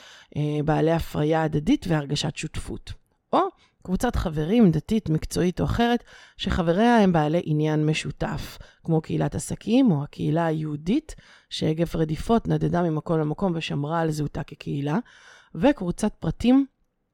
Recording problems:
none

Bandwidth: 17 kHz